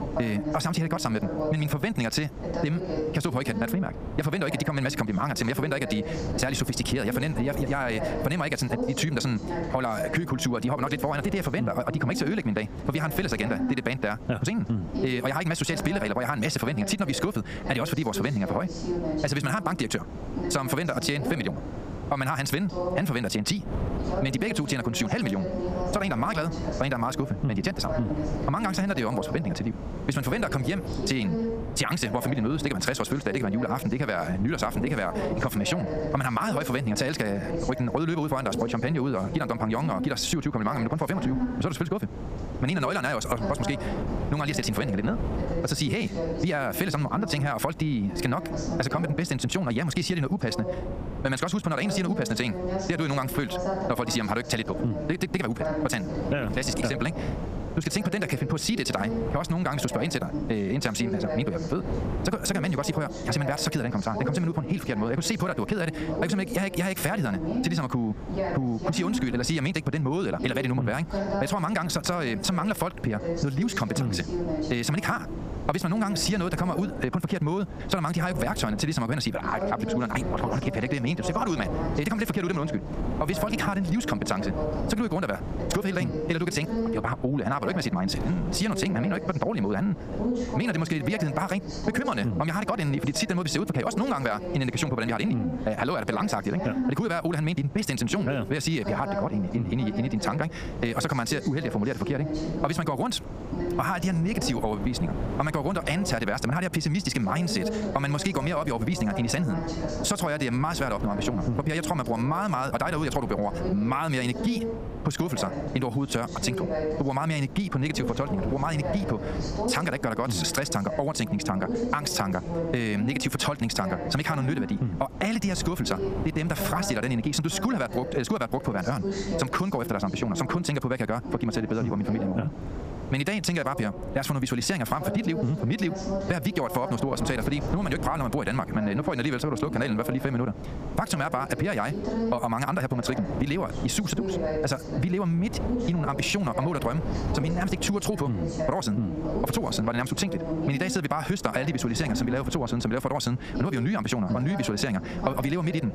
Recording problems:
wrong speed, natural pitch; too fast; 1.6 times normal speed
squashed, flat; somewhat, background pumping
voice in the background; loud; throughout; 7 dB below the speech
wind noise on the microphone; occasional gusts; 15 dB below the speech

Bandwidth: 15 kHz